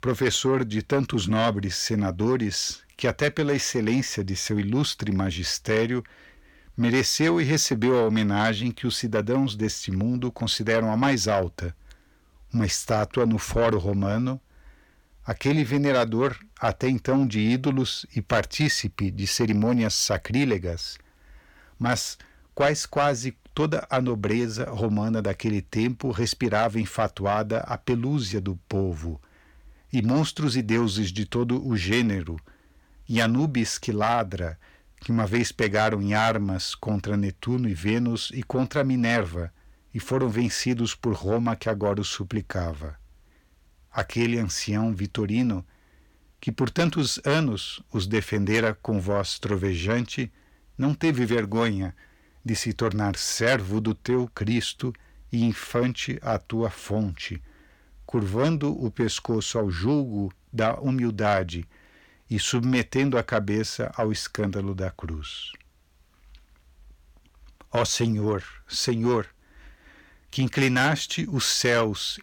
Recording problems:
distortion; slight; 10 dB below the speech

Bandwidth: 18.5 kHz